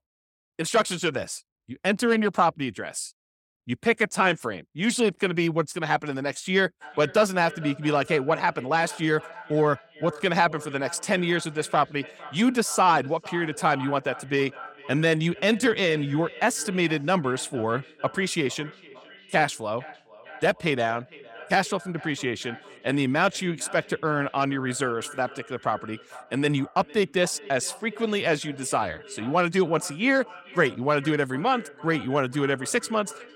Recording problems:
echo of what is said; faint; from 7 s on; 450 ms later, 20 dB below the speech

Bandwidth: 17 kHz